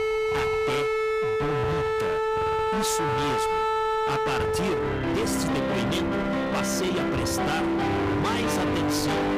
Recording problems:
distortion; heavy; 48% of the sound clipped
background music; very loud; throughout; 4 dB above the speech
low rumble; noticeable; throughout; 15 dB below the speech

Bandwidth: 15 kHz